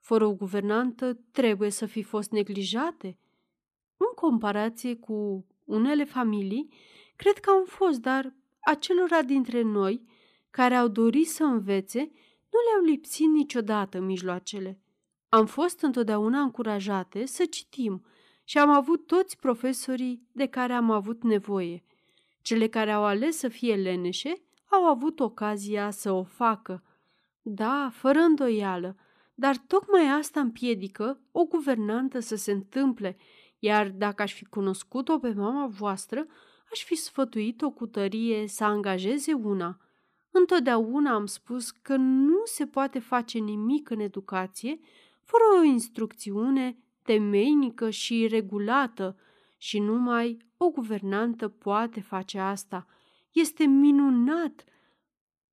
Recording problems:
none

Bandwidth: 14.5 kHz